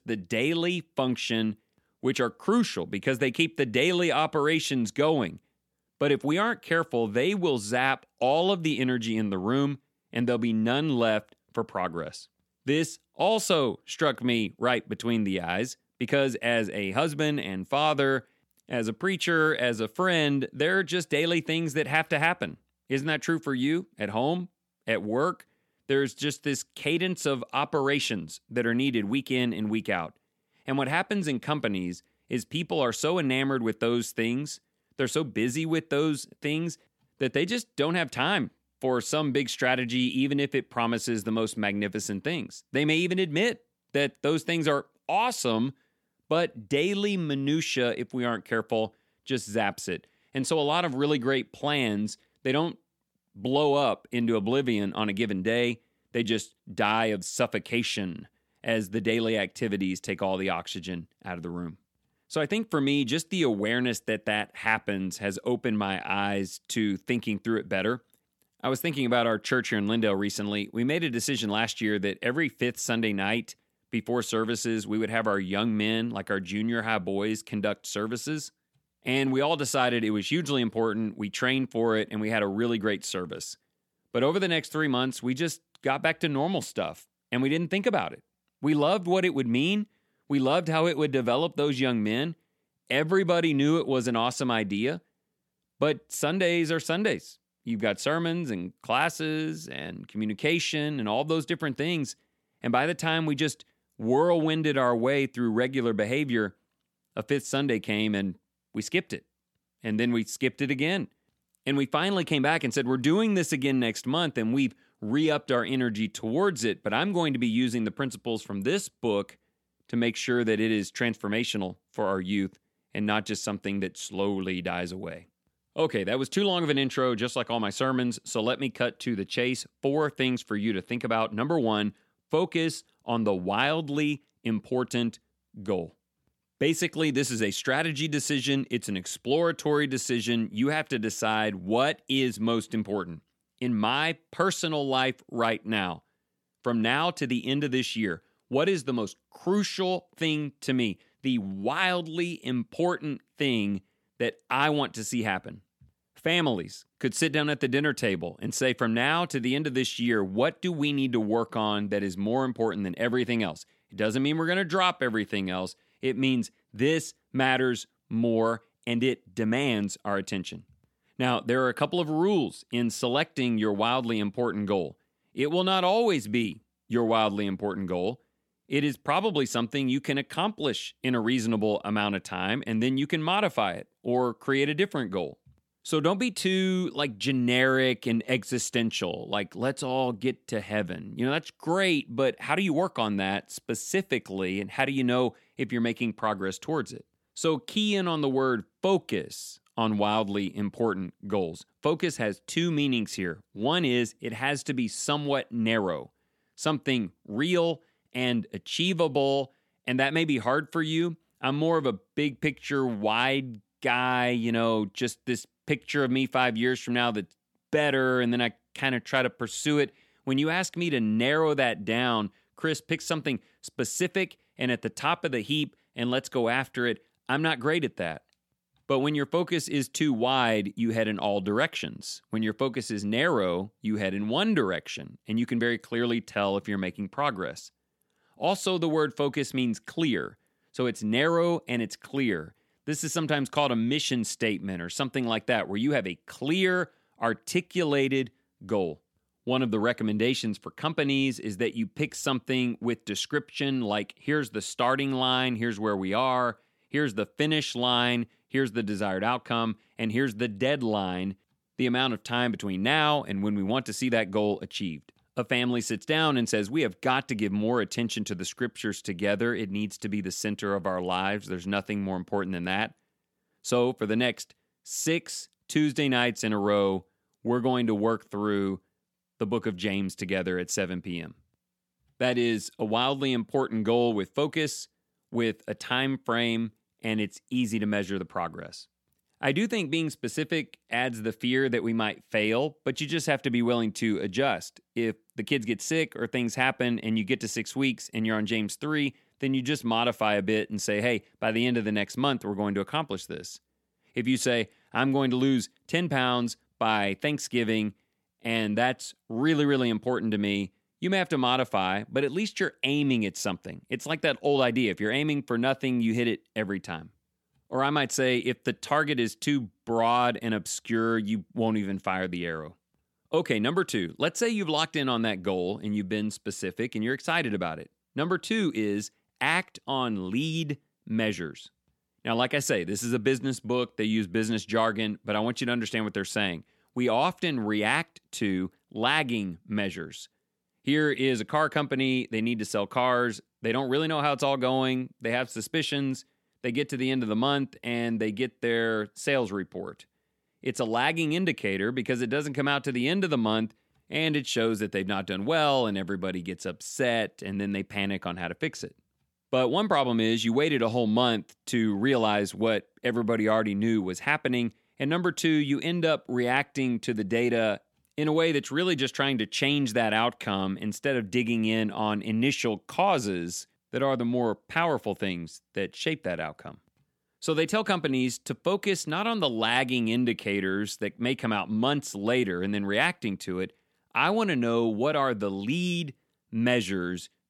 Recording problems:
none

